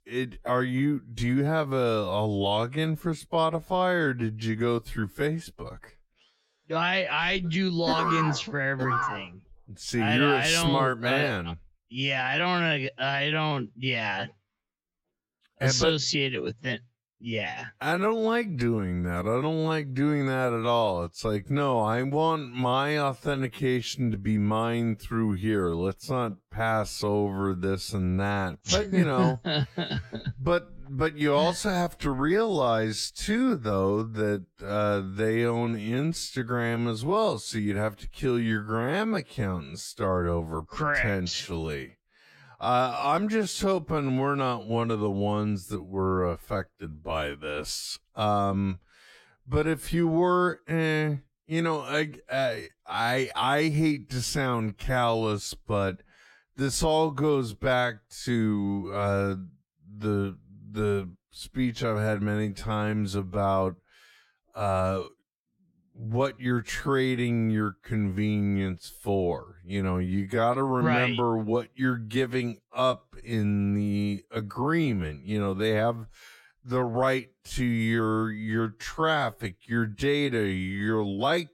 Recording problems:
wrong speed, natural pitch; too slow; 0.6 times normal speed

